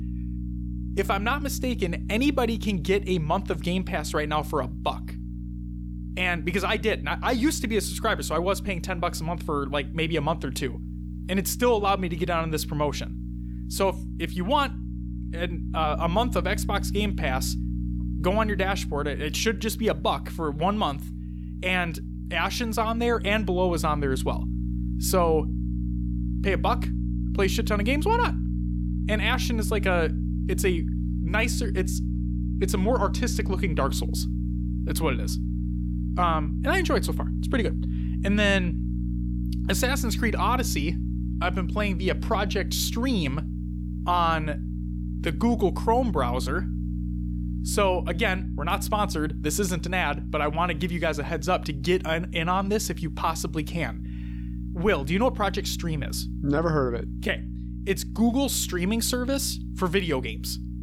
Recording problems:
electrical hum; noticeable; throughout; 60 Hz, 15 dB below the speech

